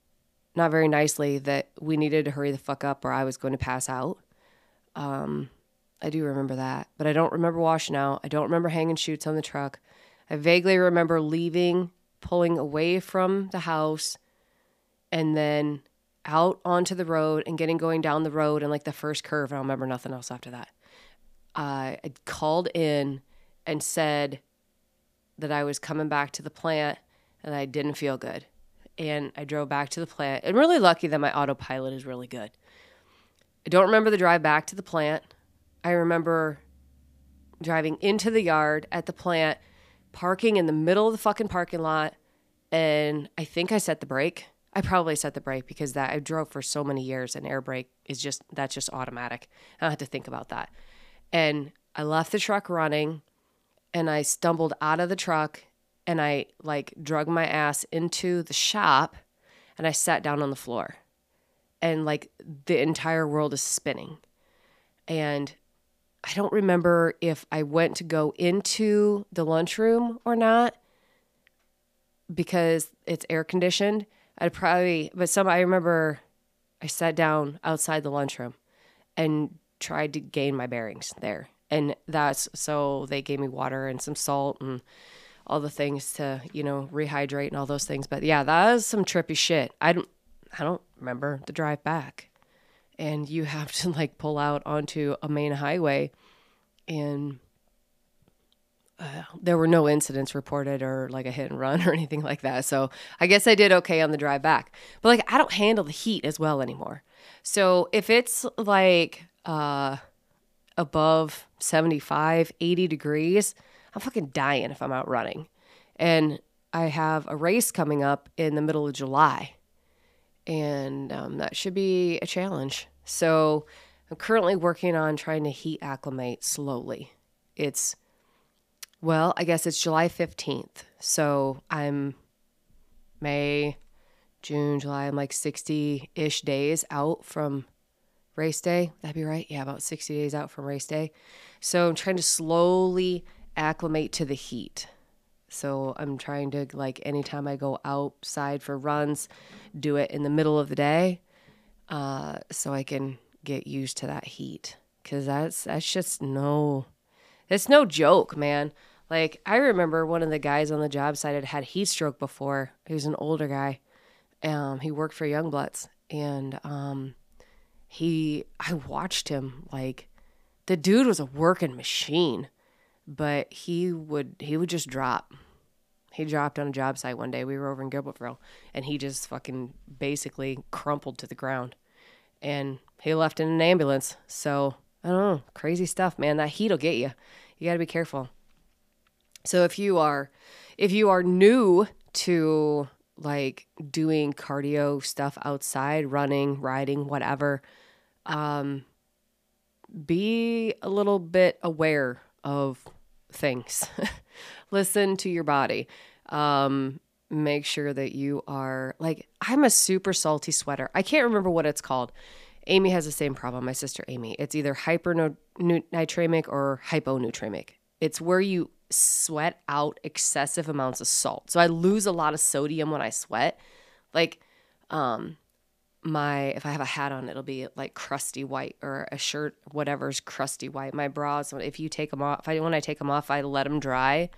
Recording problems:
none

